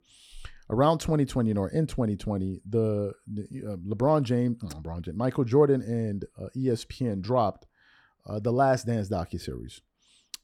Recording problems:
none

